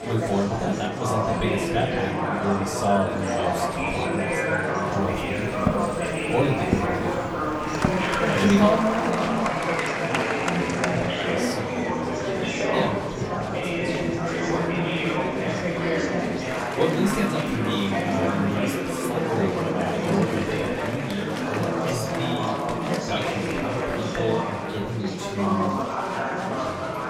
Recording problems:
off-mic speech; far
room echo; slight; dies away in 0.3 s
murmuring crowd; very loud; throughout; 3 dB above the speech
footsteps; loud; from 5.5 to 8.5 s; peak level with the speech
footsteps; faint; from 12 to 16 s; peak 10 dB below the speech

